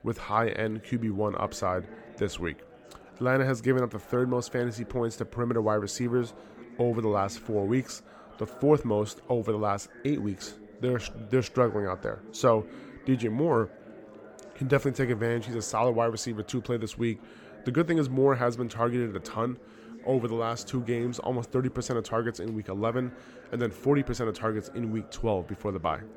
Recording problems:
chatter from many people; noticeable; throughout; 20 dB below the speech

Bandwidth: 18.5 kHz